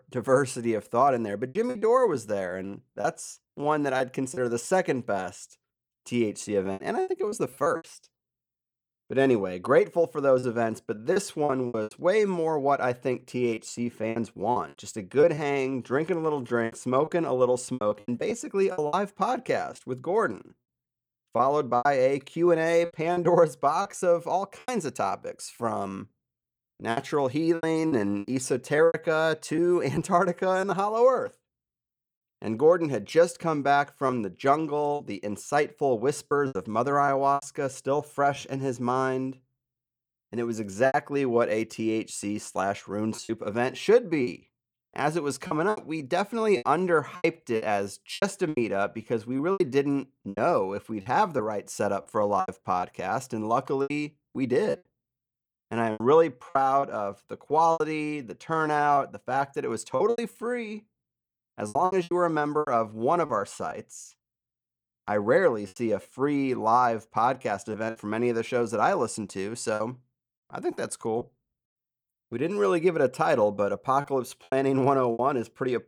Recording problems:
choppy; very; 8% of the speech affected

